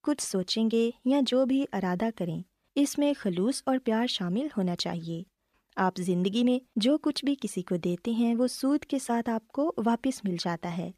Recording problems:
none

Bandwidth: 14.5 kHz